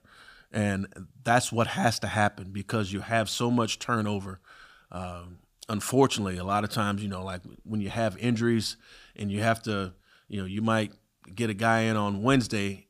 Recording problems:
none

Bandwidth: 15 kHz